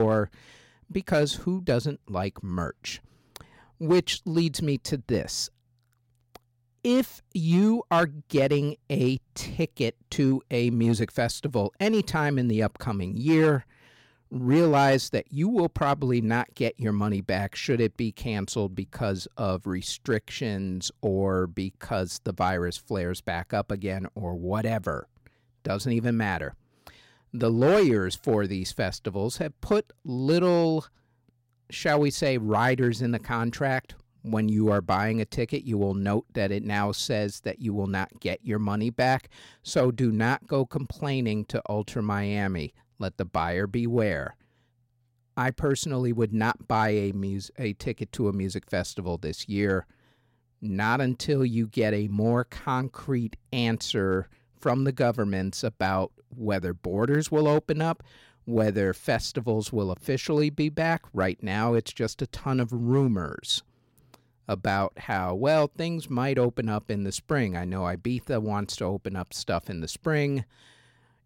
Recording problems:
abrupt cut into speech; at the start

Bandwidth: 16 kHz